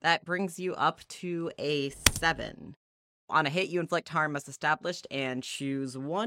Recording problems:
keyboard typing; loud; at 2 s; peak 5 dB above the speech
abrupt cut into speech; at the end

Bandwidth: 16 kHz